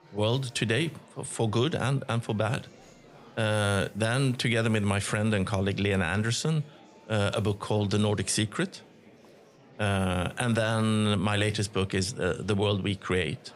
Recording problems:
murmuring crowd; faint; throughout; 25 dB below the speech

